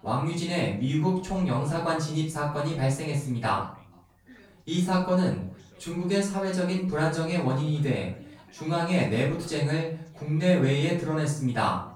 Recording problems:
off-mic speech; far
room echo; noticeable; dies away in 0.4 s
background chatter; faint; throughout; 2 voices, 25 dB below the speech

